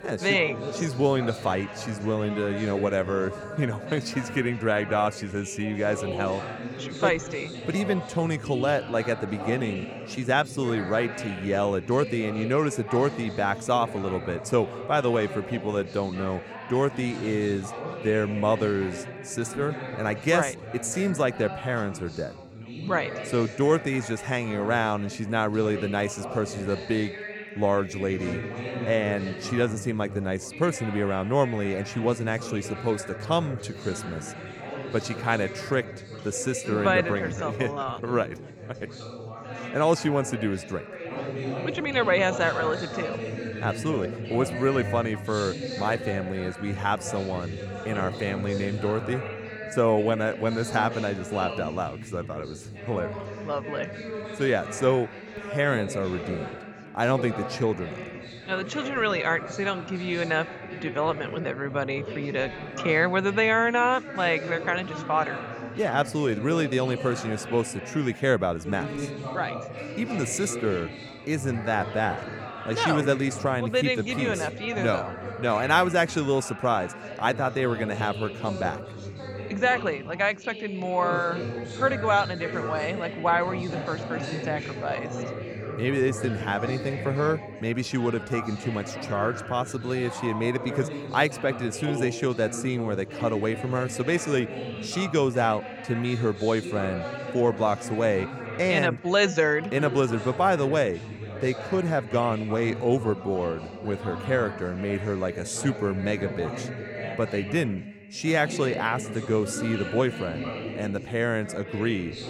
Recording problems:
background chatter; loud; throughout; 4 voices, 9 dB below the speech

